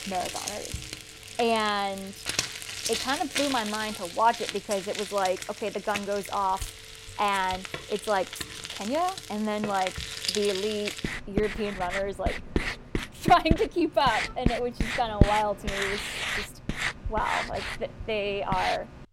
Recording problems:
household noises; loud; throughout; 4 dB below the speech
traffic noise; faint; throughout; 25 dB below the speech

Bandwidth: 16 kHz